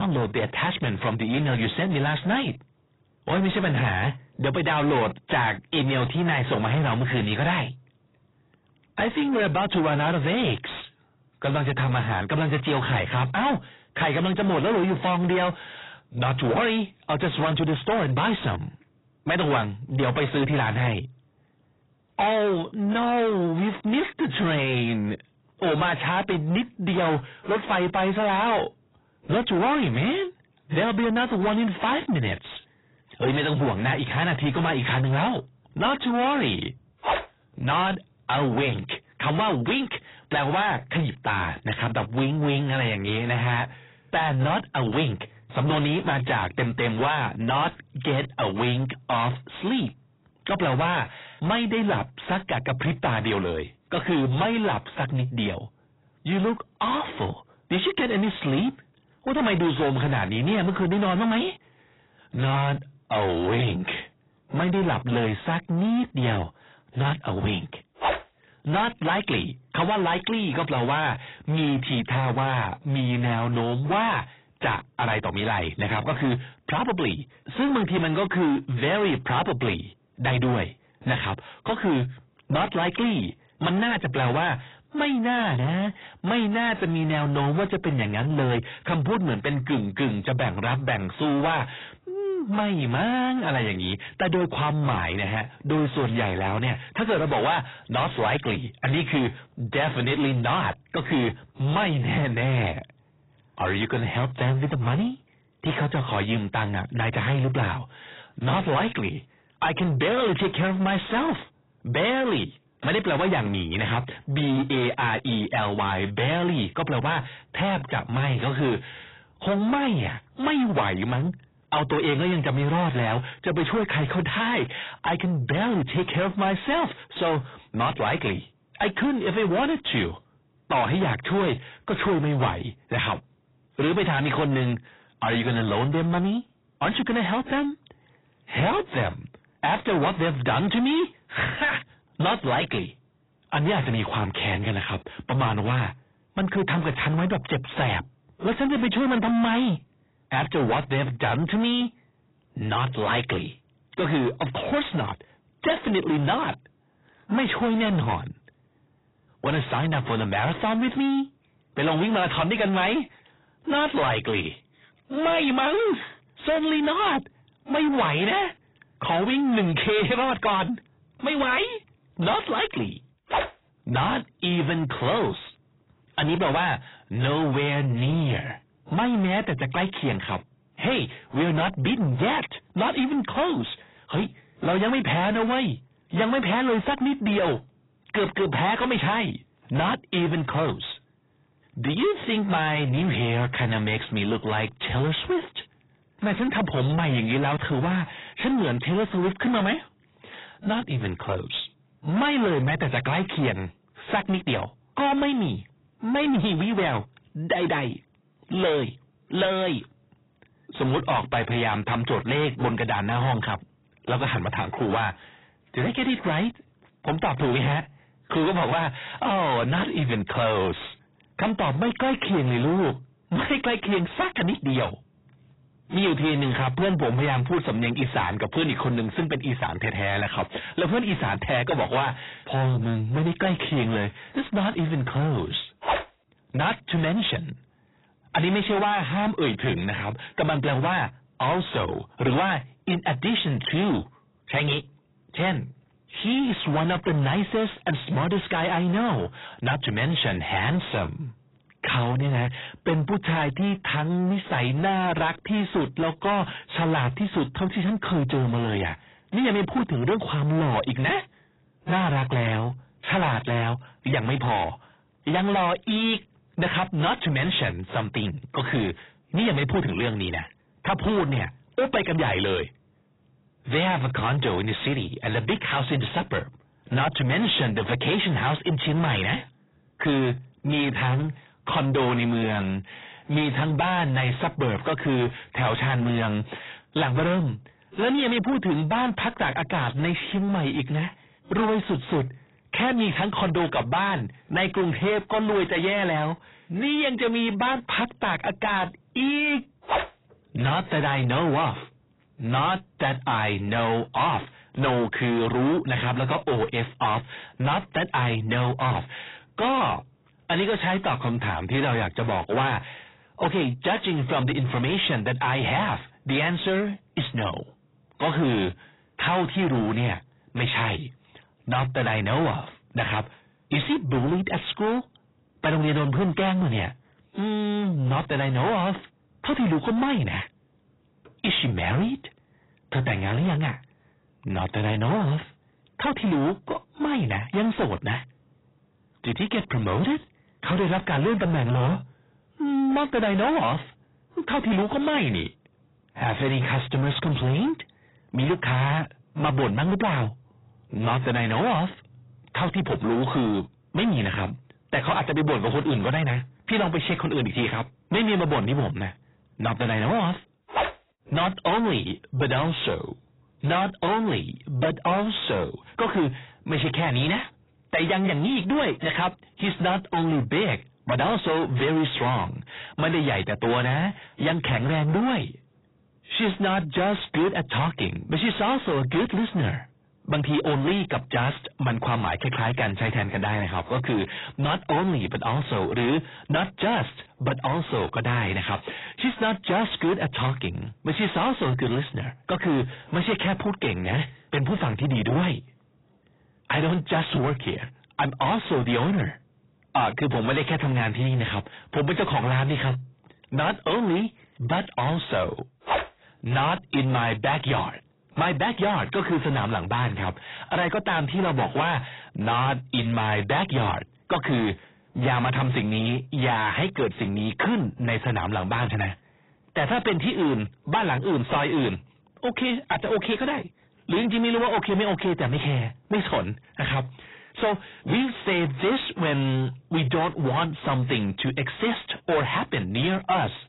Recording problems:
distortion; heavy; 6 dB below the speech
garbled, watery; badly; nothing above 4 kHz
abrupt cut into speech; at the start

